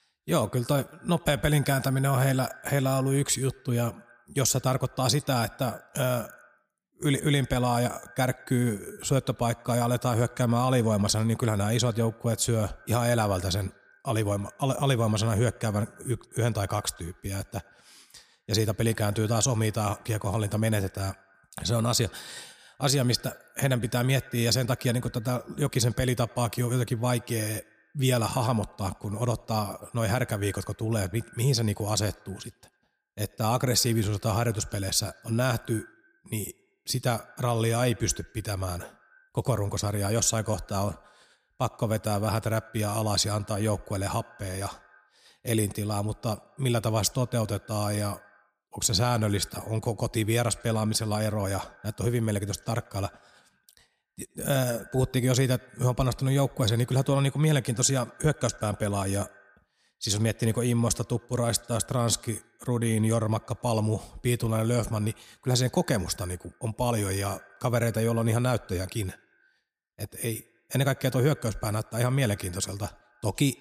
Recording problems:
echo of what is said; faint; throughout; 90 ms later, 25 dB below the speech

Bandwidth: 15 kHz